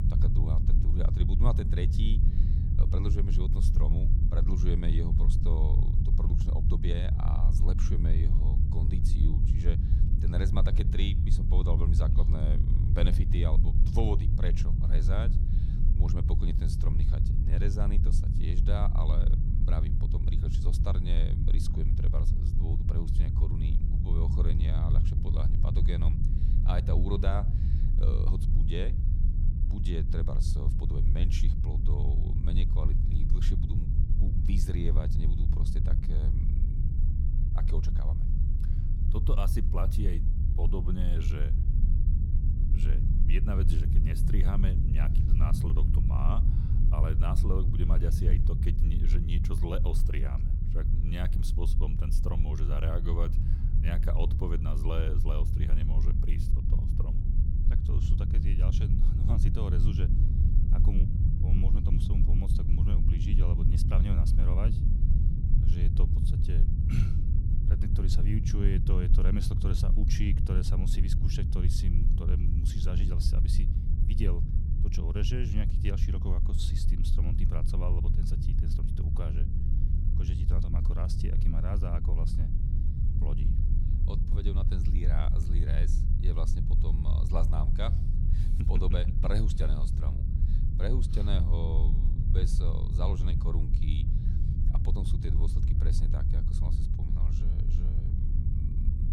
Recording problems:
low rumble; loud; throughout; 2 dB below the speech

